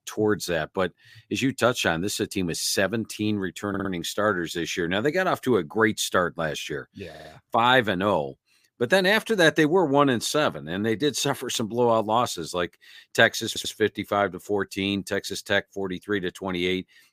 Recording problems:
audio stuttering; at 3.5 s, at 7 s and at 13 s

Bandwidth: 15 kHz